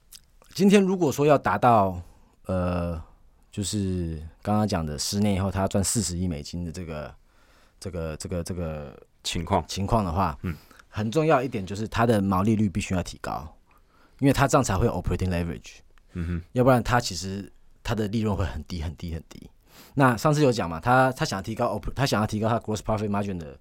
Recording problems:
none

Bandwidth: 16 kHz